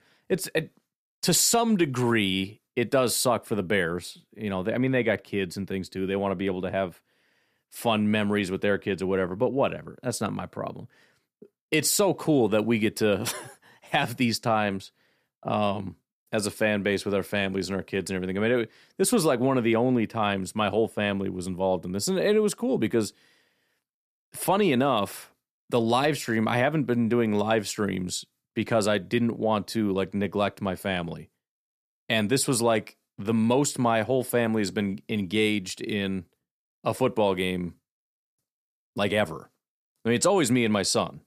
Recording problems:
none

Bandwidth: 14.5 kHz